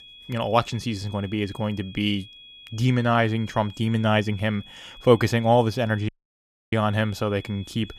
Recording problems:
high-pitched whine; noticeable; throughout; 3.5 kHz, 20 dB below the speech
audio cutting out; at 6 s for 0.5 s

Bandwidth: 15 kHz